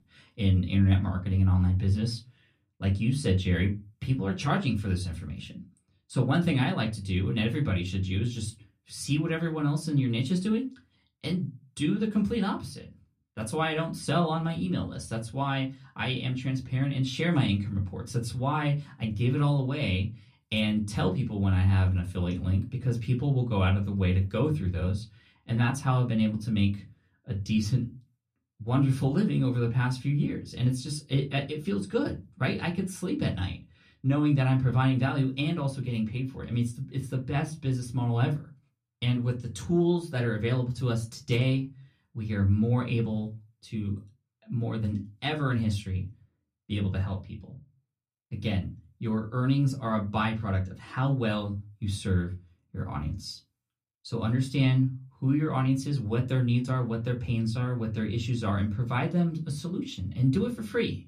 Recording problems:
off-mic speech; far
room echo; very slight; dies away in 0.2 s

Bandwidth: 14 kHz